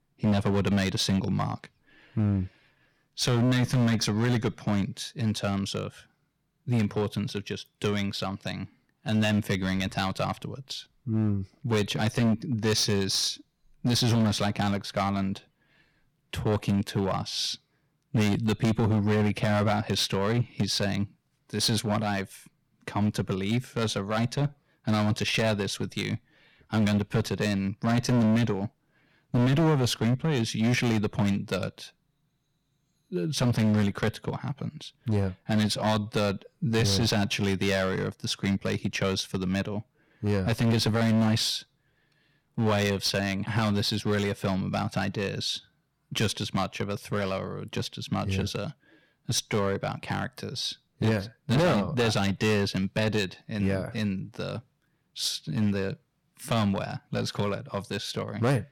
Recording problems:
distortion; heavy; 8% of the sound clipped

